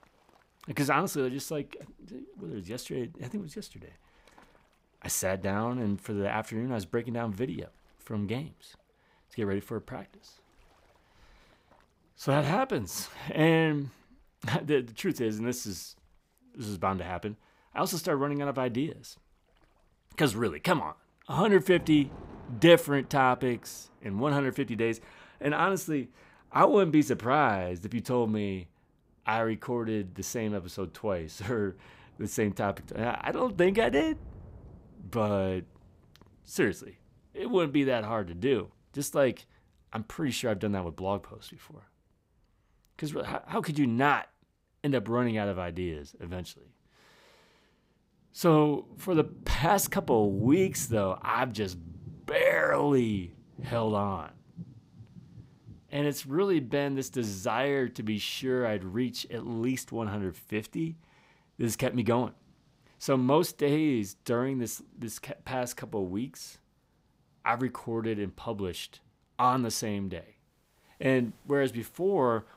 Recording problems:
rain or running water; noticeable; throughout; 20 dB below the speech

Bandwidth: 15.5 kHz